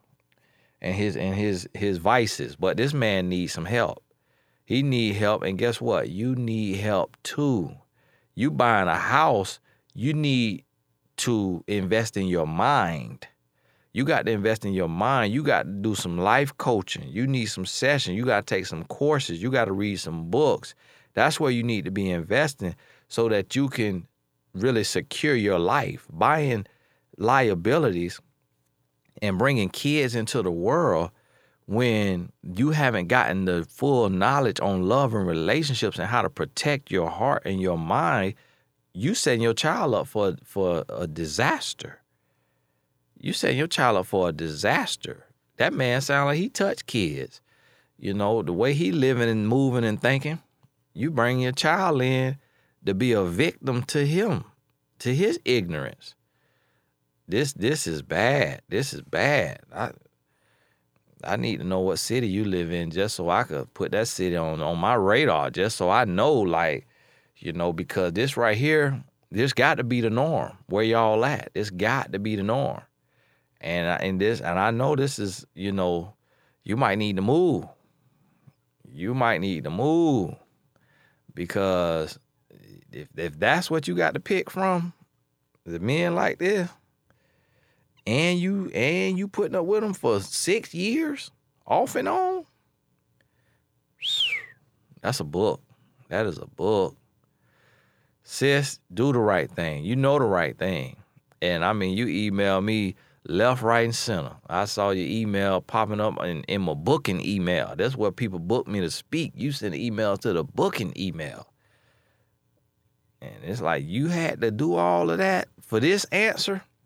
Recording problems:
none

